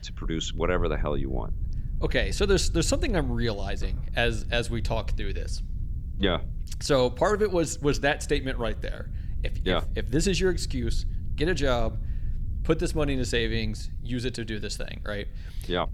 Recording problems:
low rumble; faint; throughout; 25 dB below the speech

